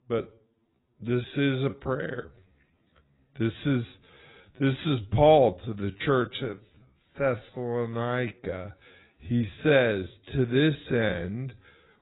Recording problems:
garbled, watery; badly; nothing above 4 kHz
wrong speed, natural pitch; too slow; 0.5 times normal speed

